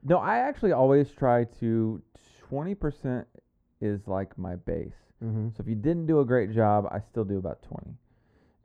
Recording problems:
muffled; very; fading above 2 kHz

